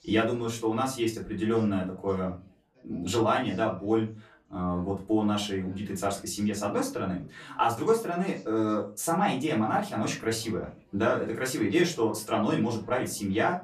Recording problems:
off-mic speech; far
room echo; very slight; dies away in 0.3 s
background chatter; faint; throughout; 4 voices, 25 dB below the speech

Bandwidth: 14 kHz